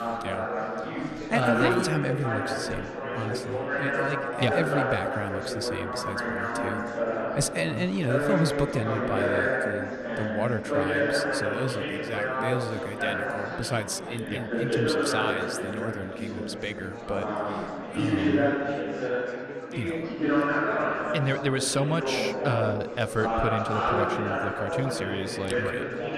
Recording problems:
chatter from many people; very loud; throughout; 2 dB above the speech

